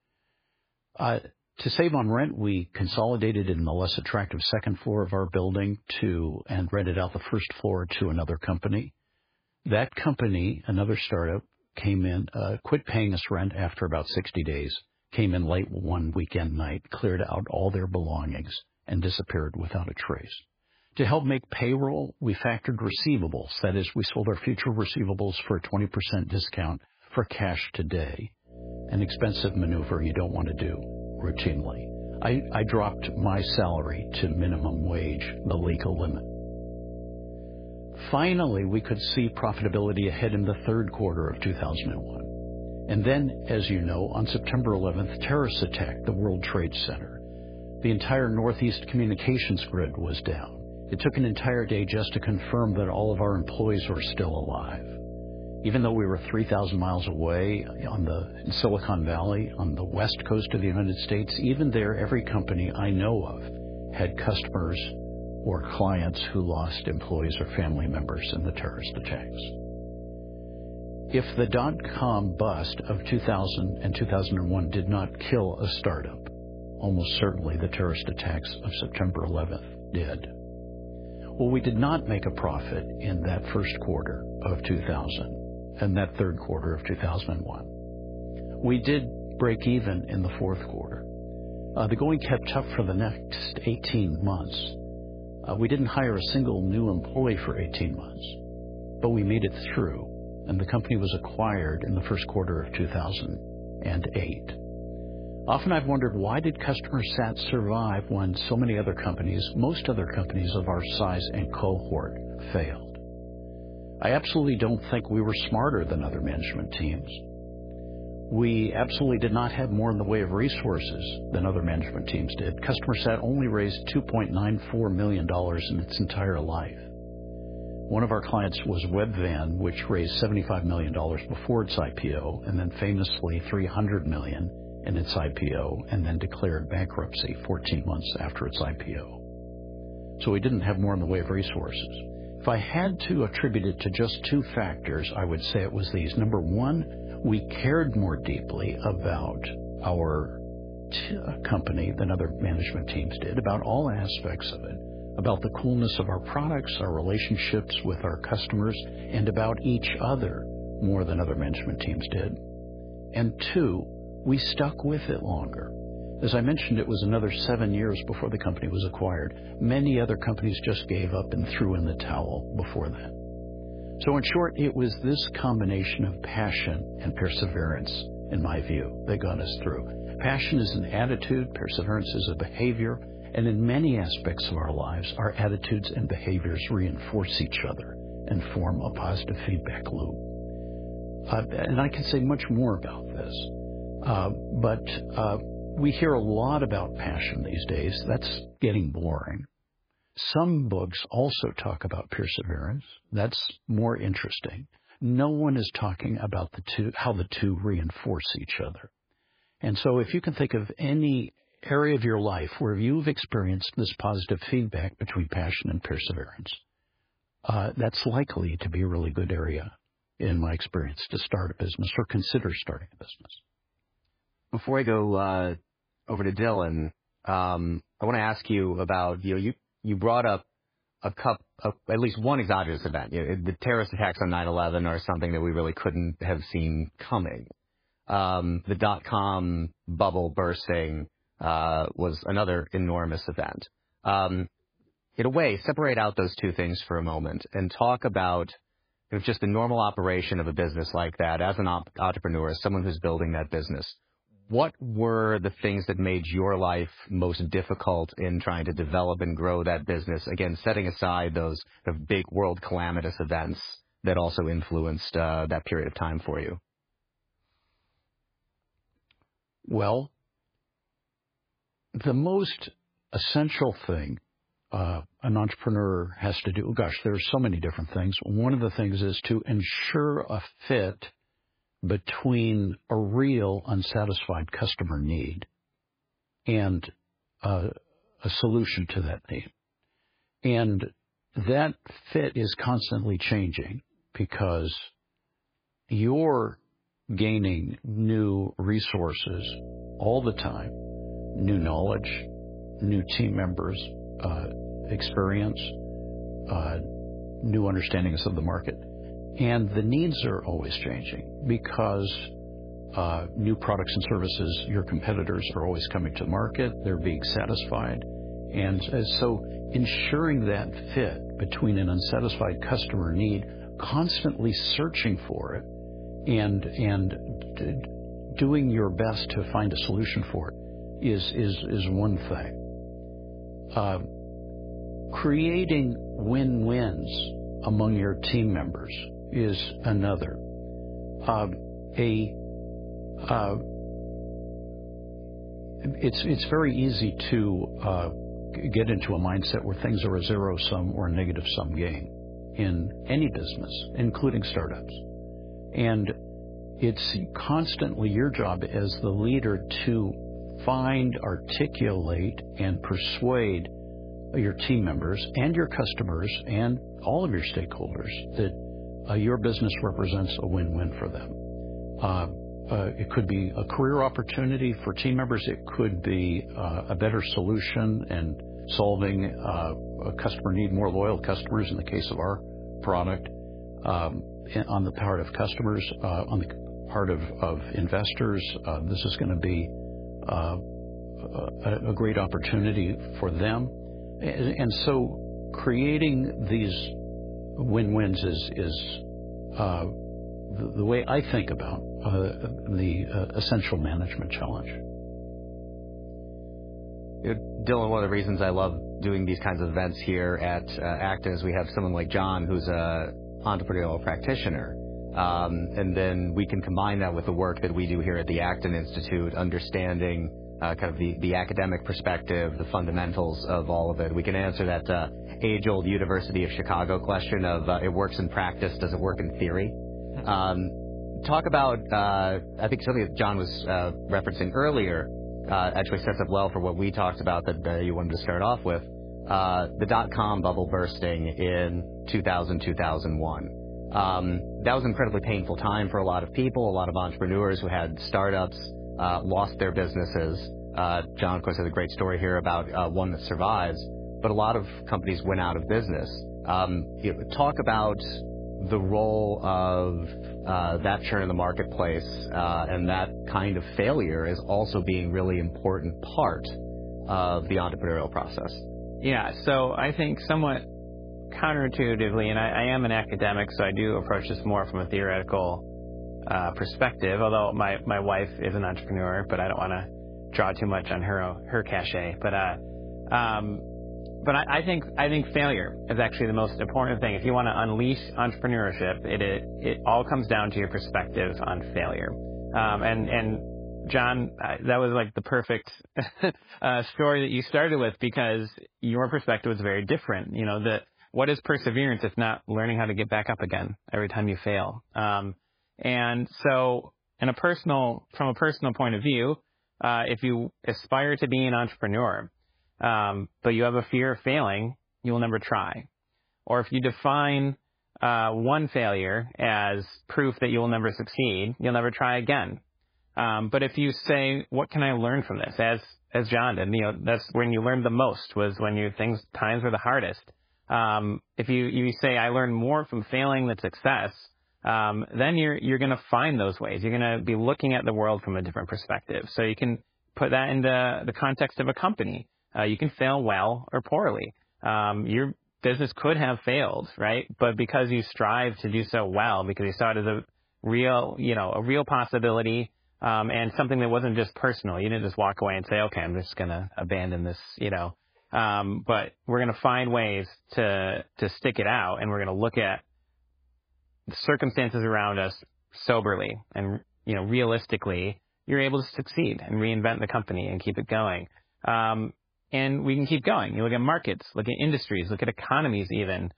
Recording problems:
garbled, watery; badly
electrical hum; noticeable; from 29 s to 3:18 and from 4:59 to 8:14; 60 Hz, 15 dB below the speech

